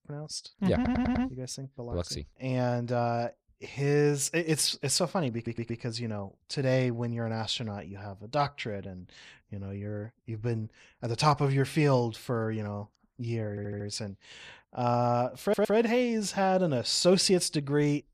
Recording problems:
audio stuttering; 4 times, first at 1 s

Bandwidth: 14 kHz